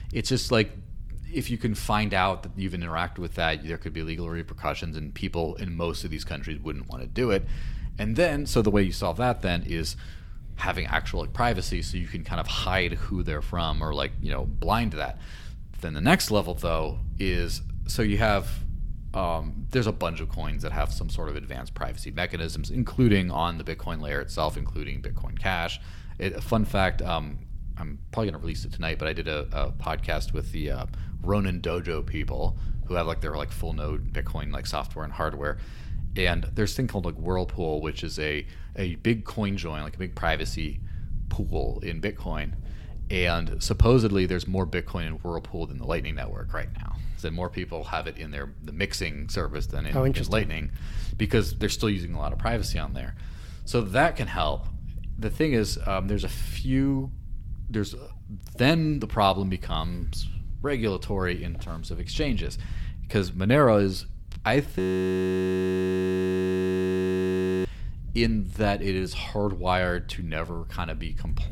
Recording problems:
low rumble; faint; throughout; 25 dB below the speech
audio freezing; at 1:05 for 3 s

